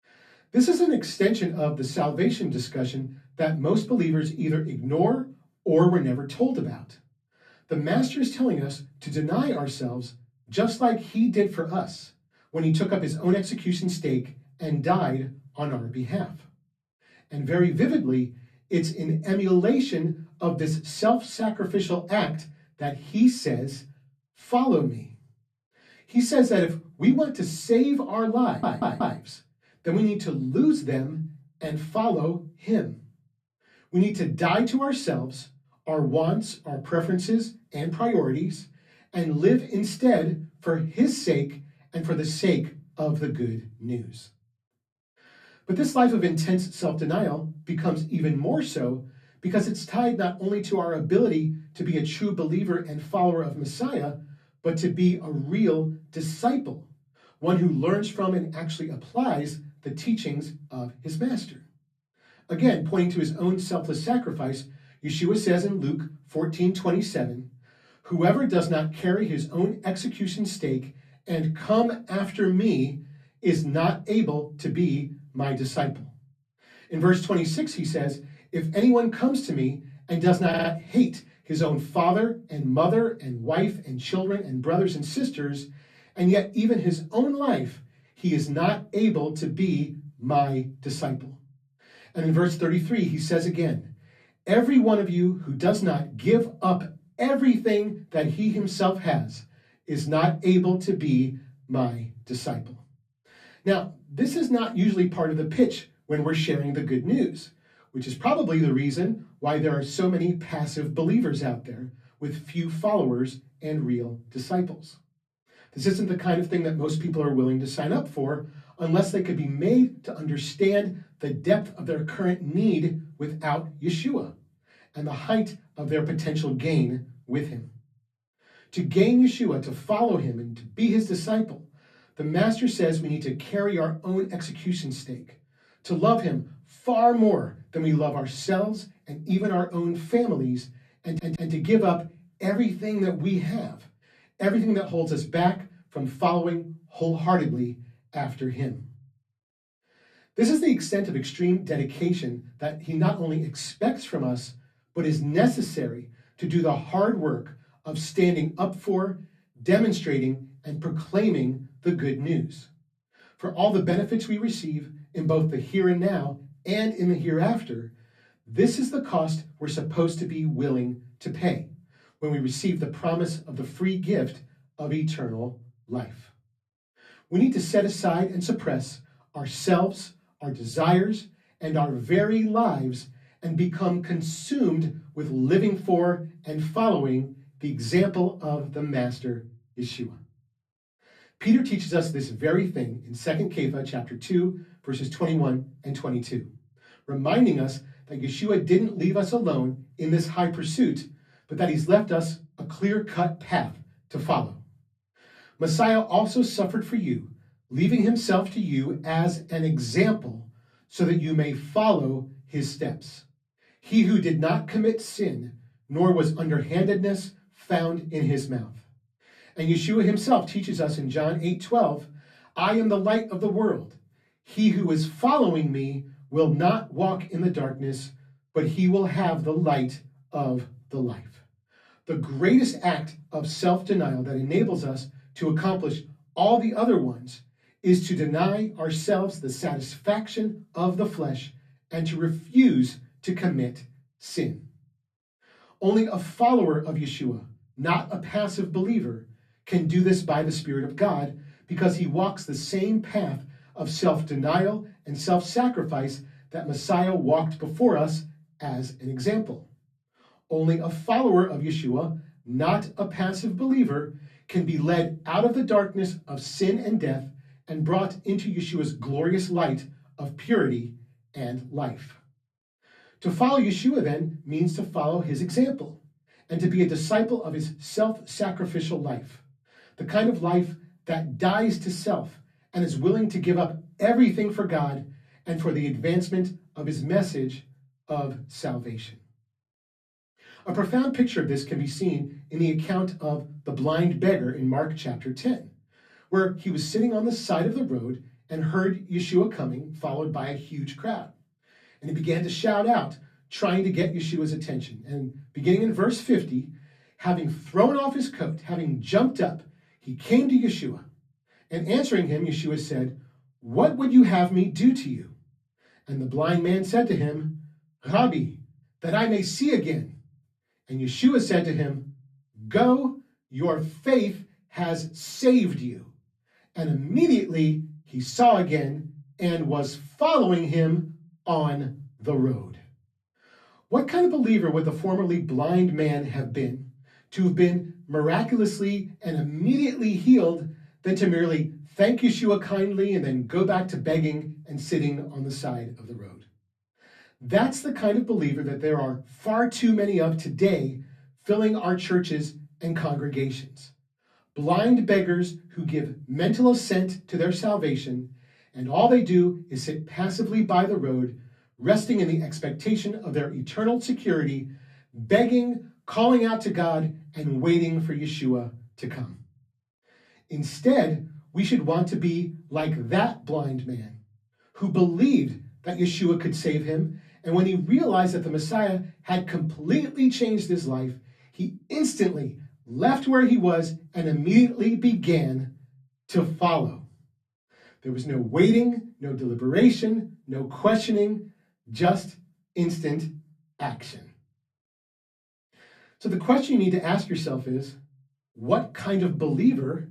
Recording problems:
off-mic speech; far
room echo; very slight; dies away in 0.3 s
audio stuttering; at 28 s, at 1:20 and at 2:21

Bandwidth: 14.5 kHz